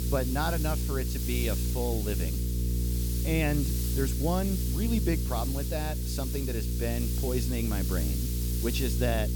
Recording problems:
electrical hum; loud; throughout; 60 Hz, 9 dB below the speech
hiss; loud; throughout; 4 dB below the speech

